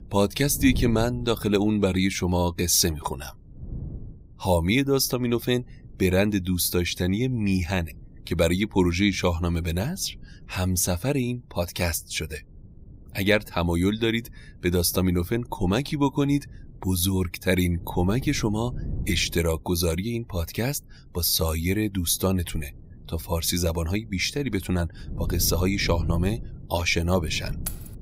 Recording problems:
wind noise on the microphone; occasional gusts; 25 dB below the speech
jangling keys; faint; at 28 s; peak 10 dB below the speech

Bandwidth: 15.5 kHz